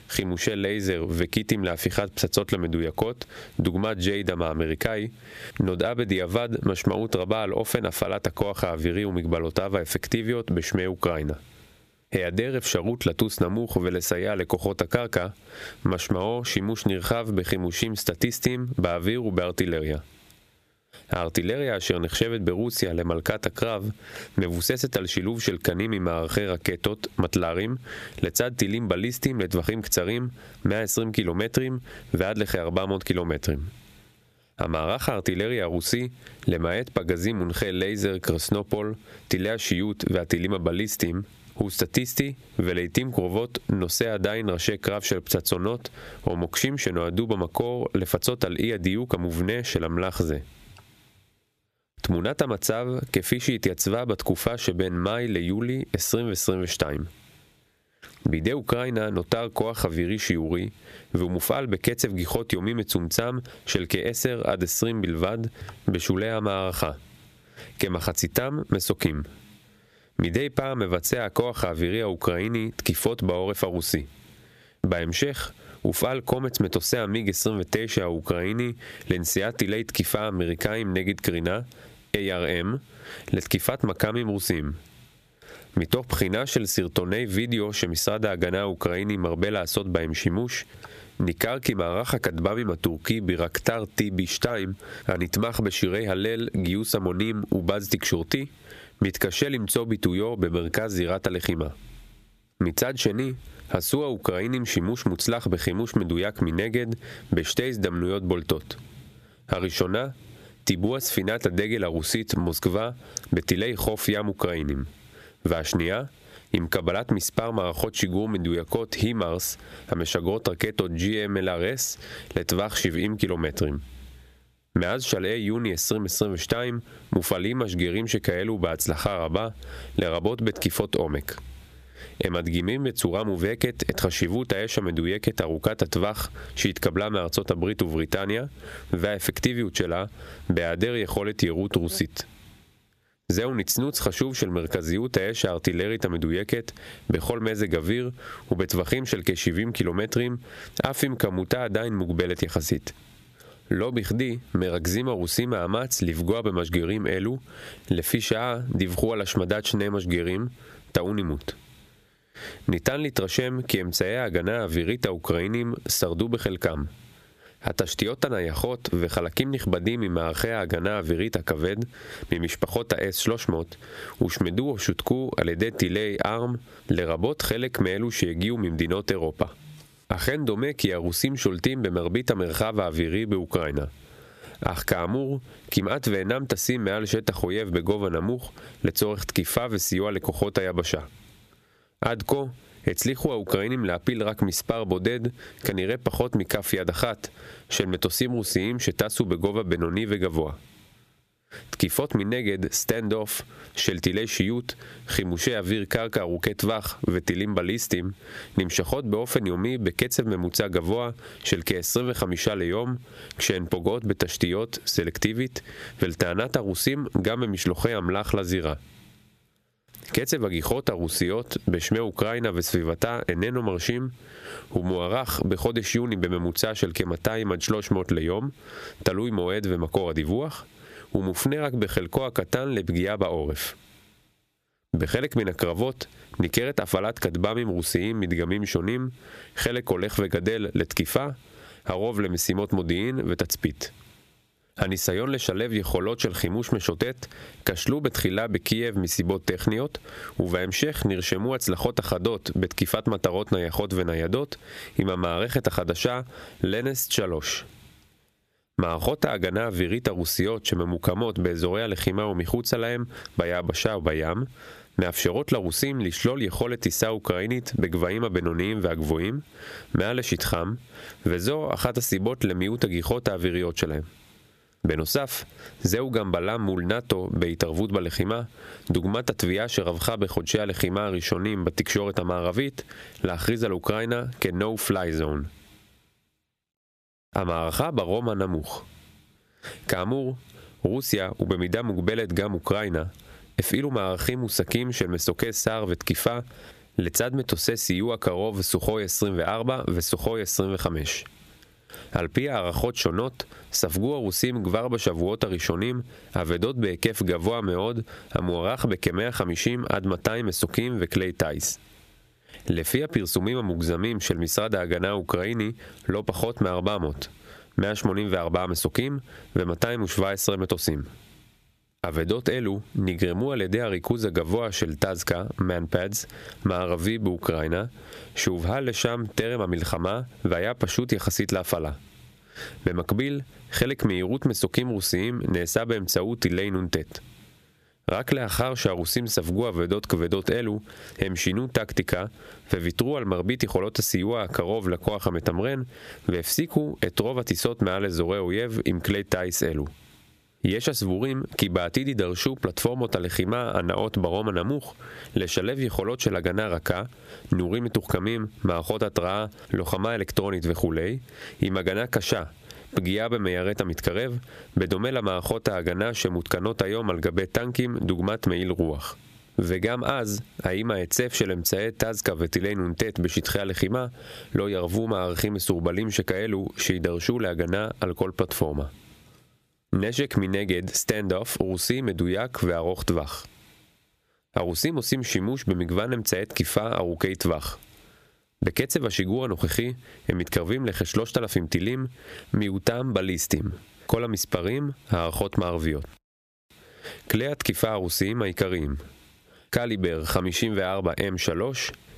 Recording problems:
squashed, flat; somewhat

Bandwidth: 14.5 kHz